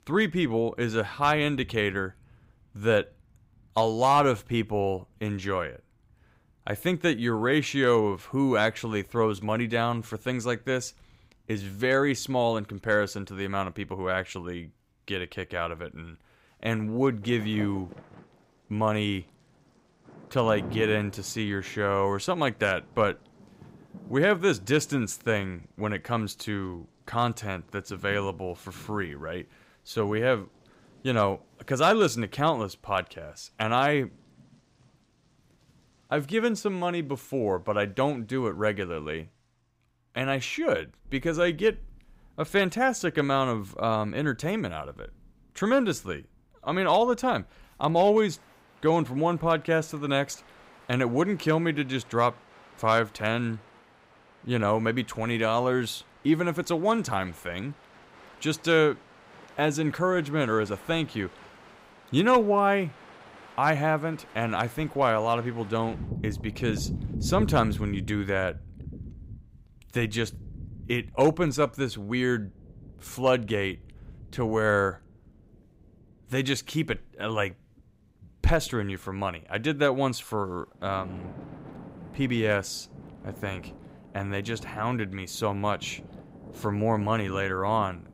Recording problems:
rain or running water; noticeable; throughout; 15 dB below the speech

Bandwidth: 15.5 kHz